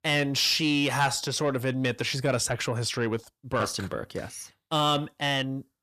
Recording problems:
distortion; slight; 10 dB below the speech

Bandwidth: 14.5 kHz